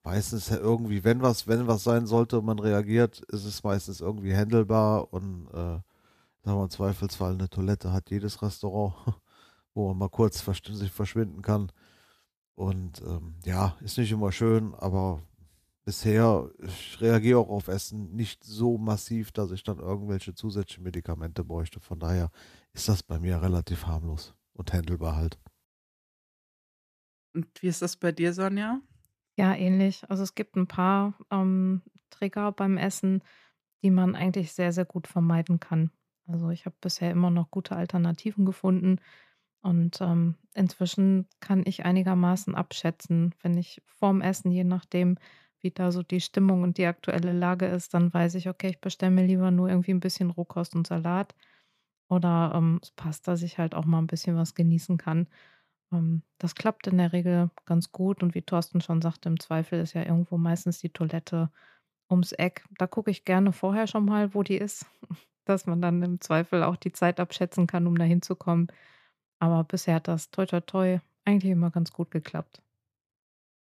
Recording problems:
none

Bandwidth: 14.5 kHz